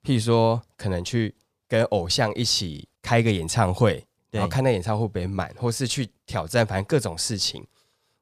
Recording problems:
none

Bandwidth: 15 kHz